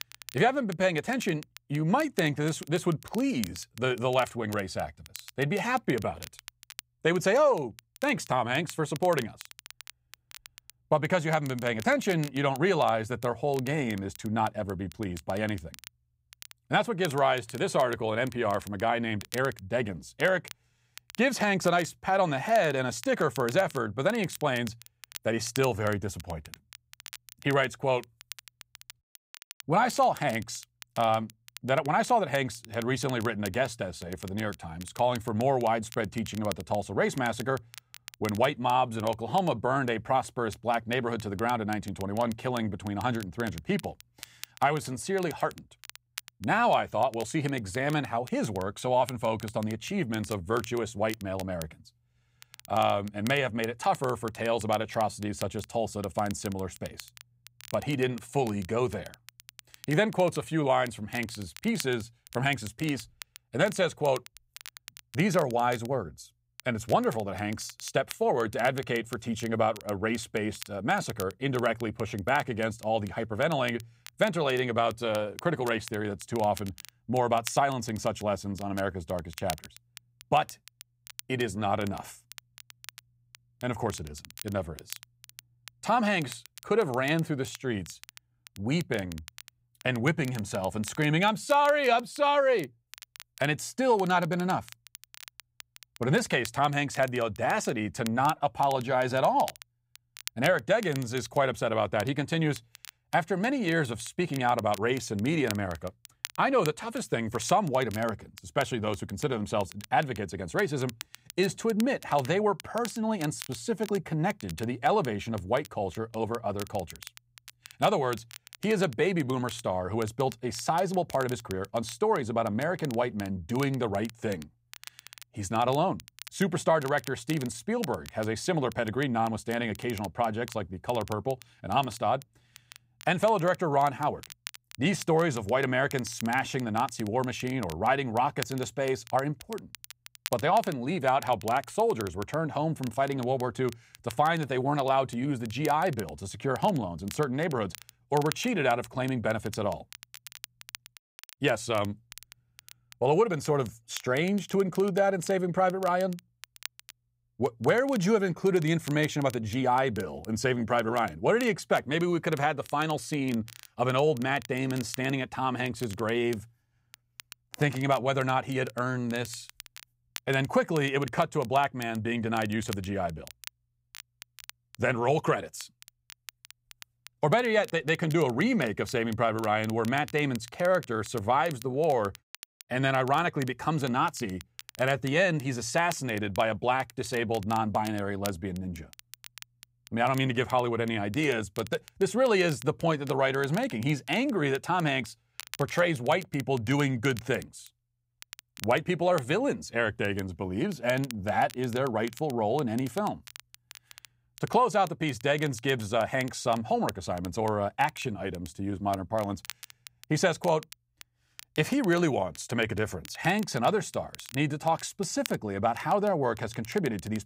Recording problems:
crackle, like an old record; noticeable; 20 dB below the speech

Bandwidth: 15.5 kHz